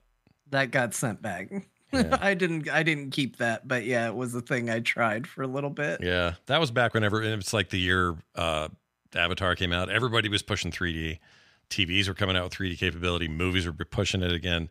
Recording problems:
none

